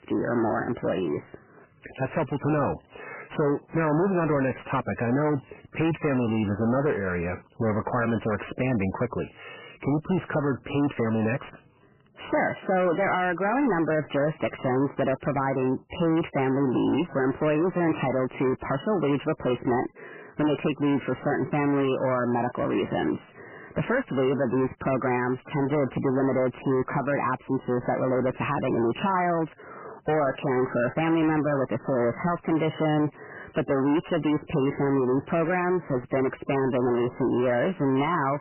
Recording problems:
distortion; heavy; 7 dB below the speech
garbled, watery; badly; nothing above 3 kHz

